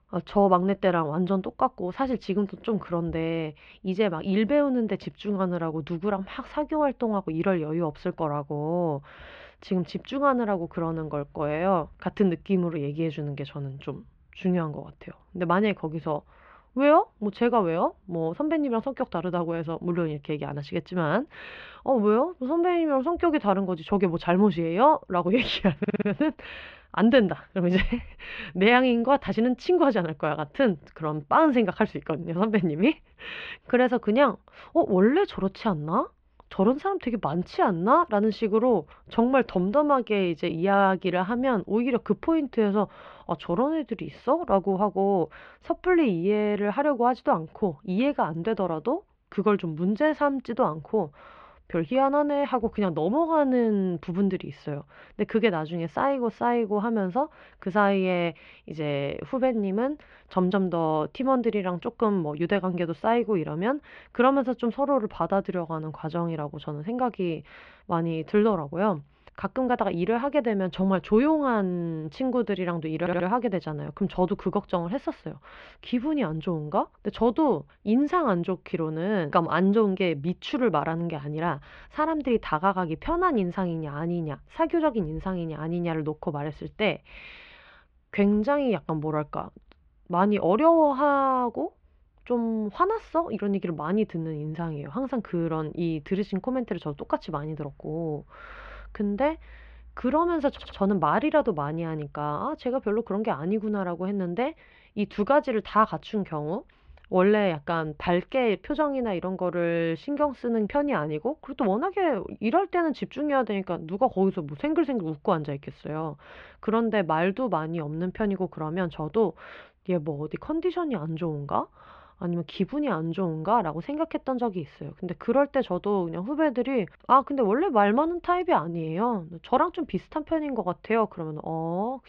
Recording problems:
muffled; very; fading above 3 kHz
audio stuttering; at 26 s, at 1:13 and at 1:41

